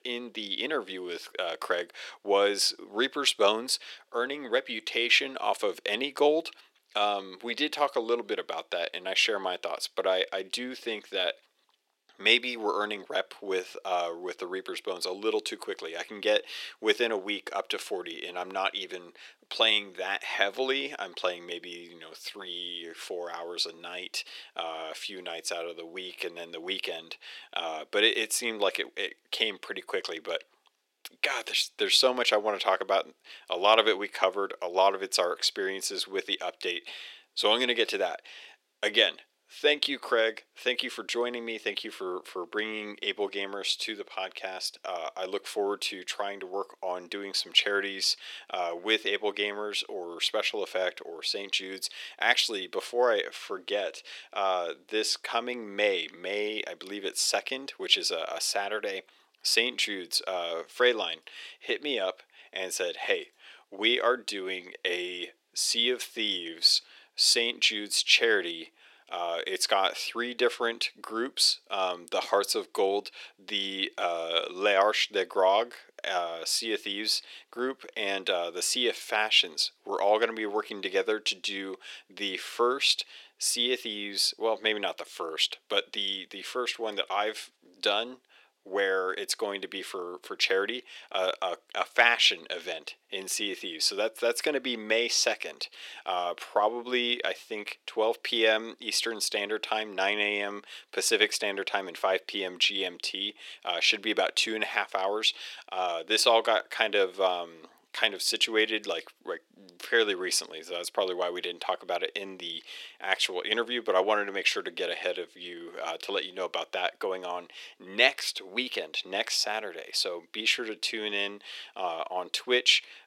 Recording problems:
thin; very; fading below 400 Hz

